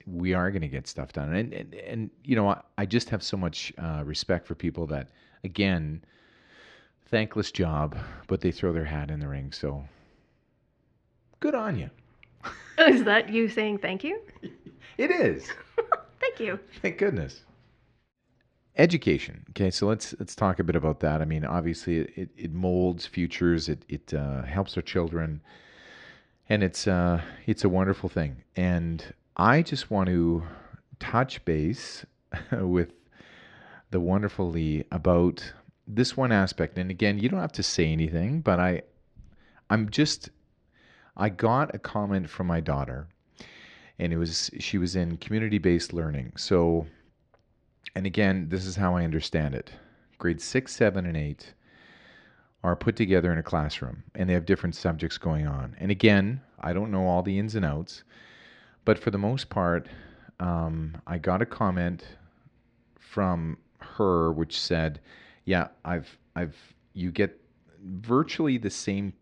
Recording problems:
muffled; slightly; fading above 2.5 kHz

